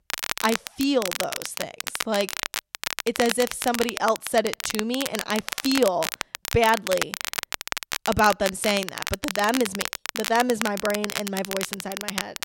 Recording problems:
crackle, like an old record; loud; 5 dB below the speech

